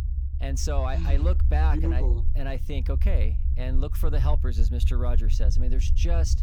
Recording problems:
low rumble; loud; throughout; 10 dB below the speech

